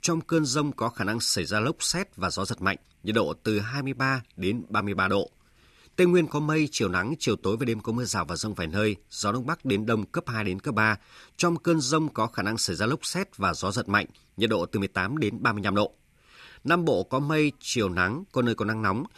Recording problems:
none

